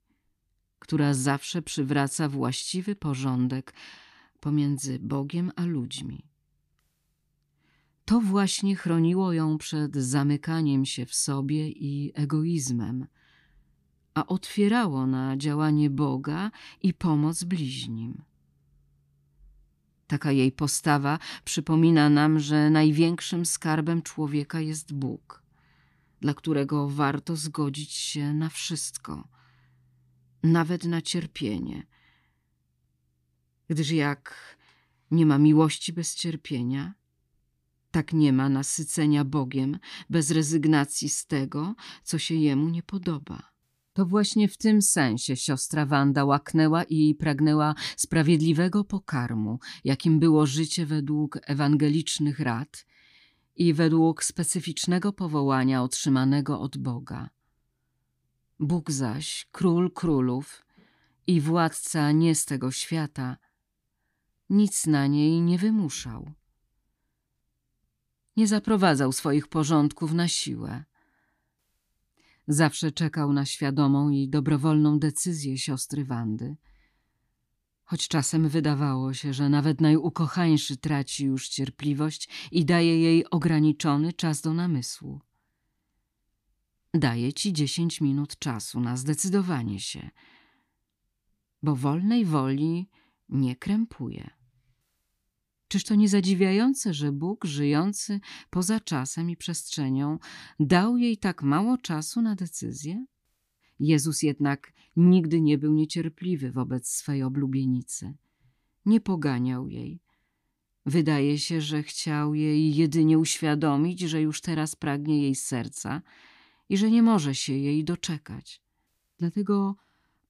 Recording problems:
none

